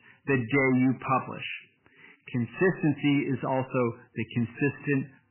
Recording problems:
garbled, watery; badly; nothing above 3 kHz
distortion; slight; 10 dB below the speech

